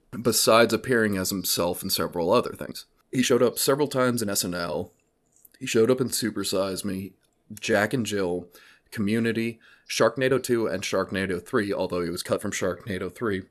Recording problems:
uneven, jittery; strongly; from 1.5 to 13 s

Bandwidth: 13.5 kHz